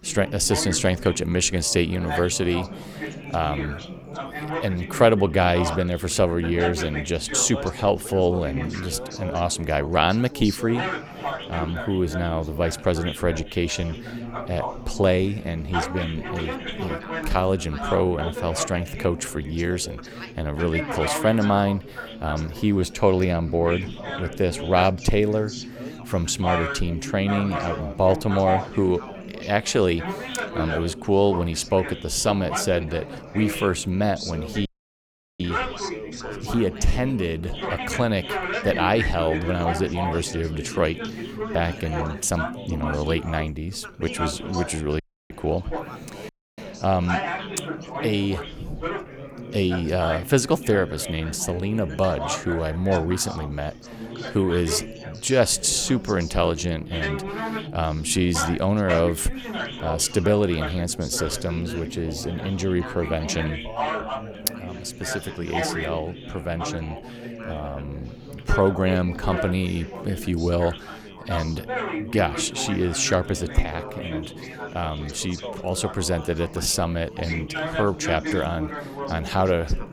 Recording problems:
background chatter; loud; throughout; 4 voices, 8 dB below the speech
audio cutting out; at 35 s for 0.5 s, at 45 s and at 46 s

